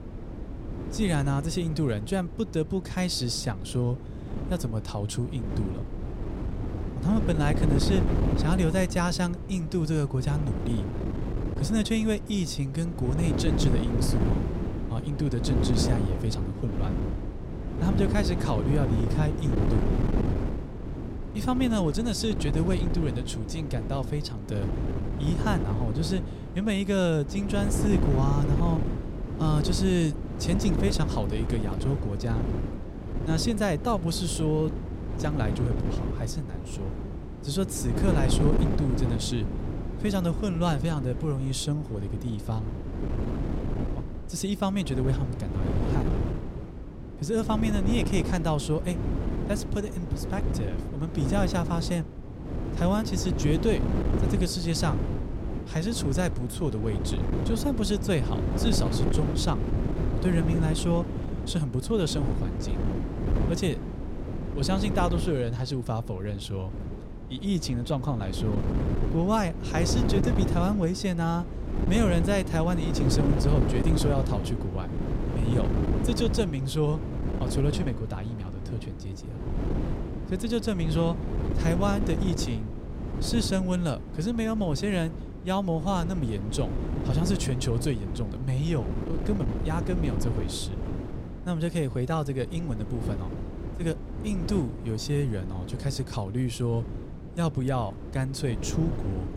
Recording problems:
wind noise on the microphone; heavy; 5 dB below the speech

